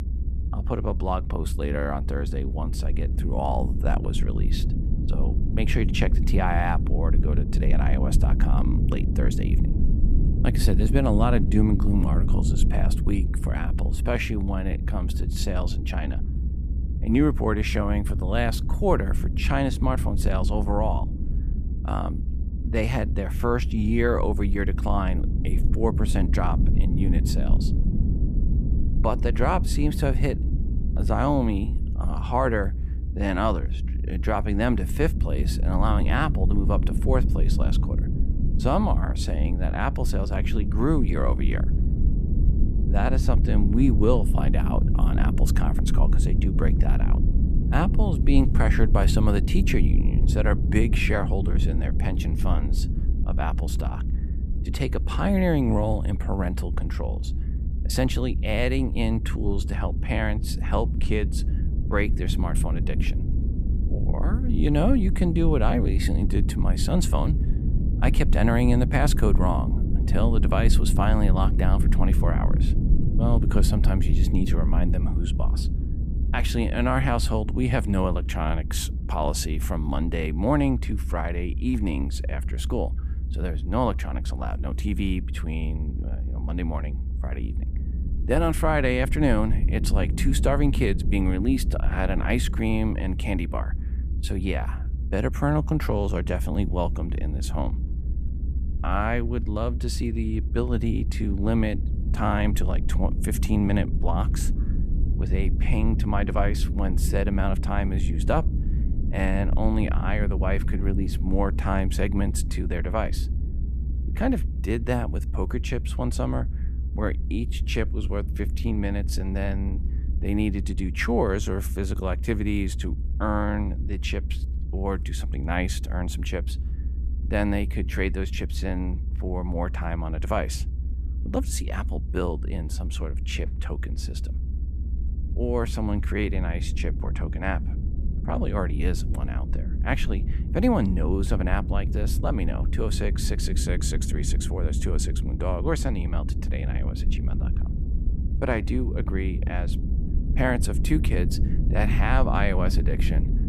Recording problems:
low rumble; noticeable; throughout; 10 dB below the speech

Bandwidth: 14.5 kHz